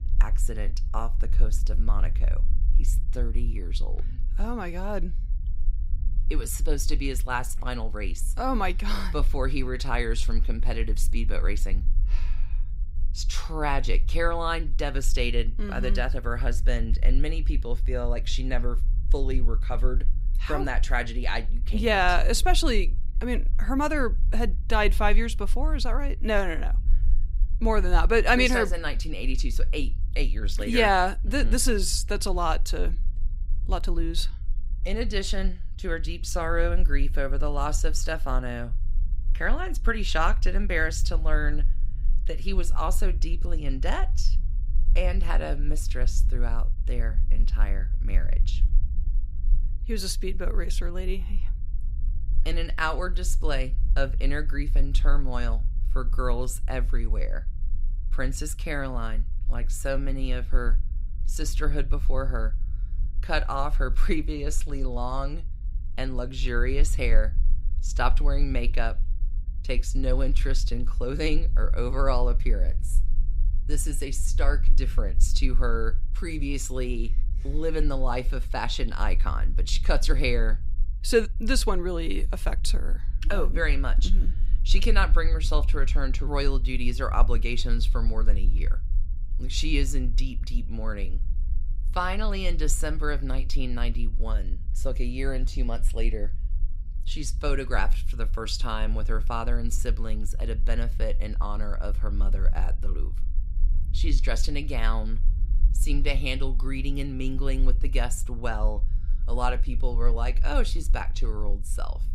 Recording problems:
low rumble; faint; throughout; 25 dB below the speech

